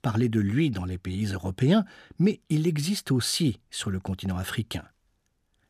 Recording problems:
none

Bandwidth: 15 kHz